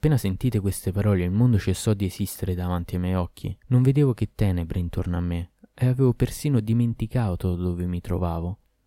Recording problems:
none

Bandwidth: 16 kHz